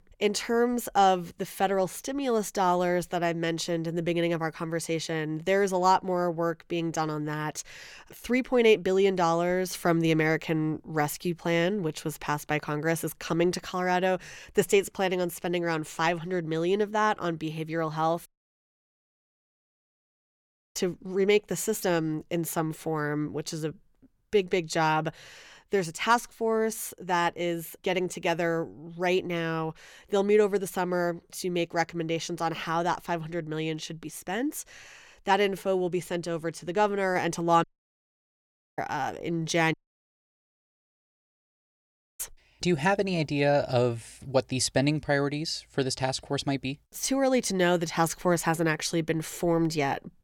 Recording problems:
audio cutting out; at 18 s for 2.5 s, at 38 s for 1 s and at 40 s for 2.5 s

